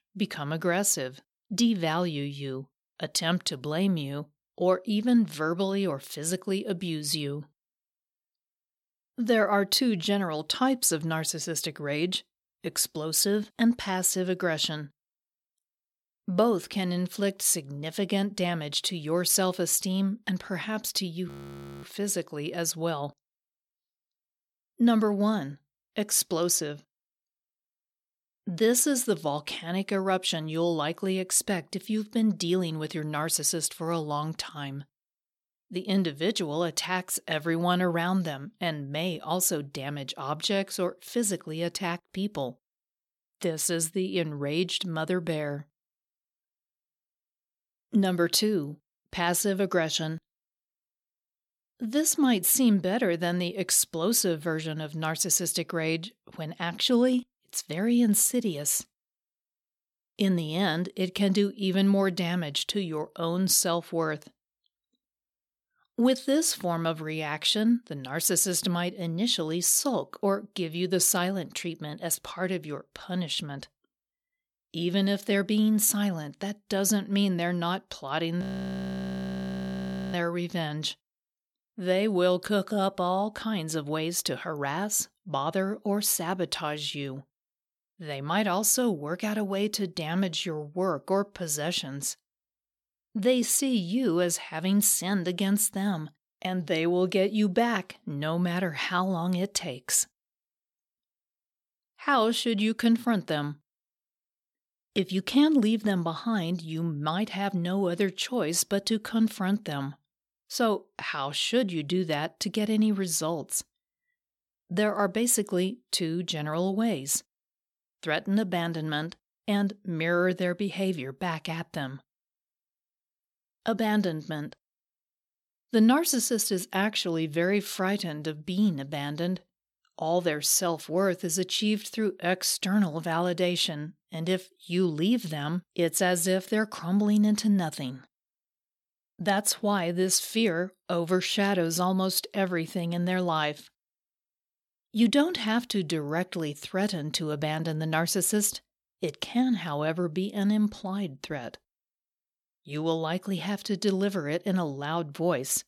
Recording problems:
audio freezing; at 21 s for 0.5 s and at 1:18 for 1.5 s

